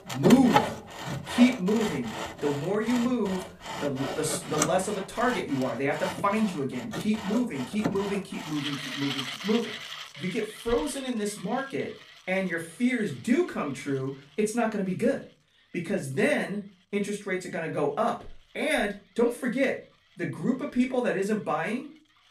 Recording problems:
off-mic speech; far
room echo; very slight; dies away in 0.3 s
machinery noise; loud; throughout; 6 dB below the speech

